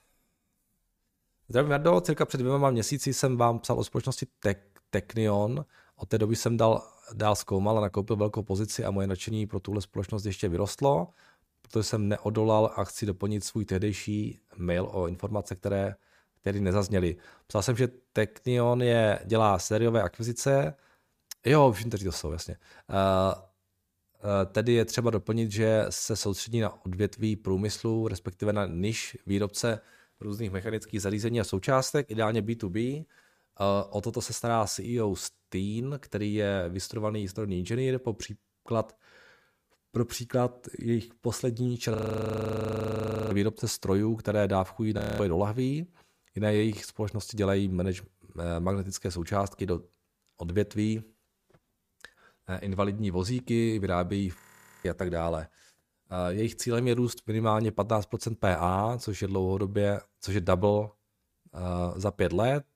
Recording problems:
audio freezing; at 42 s for 1.5 s, at 45 s and at 54 s

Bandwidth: 15 kHz